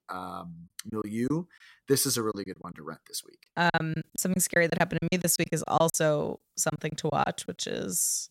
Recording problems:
choppy; very; from 1 to 2.5 s and from 3.5 to 7.5 s; 14% of the speech affected

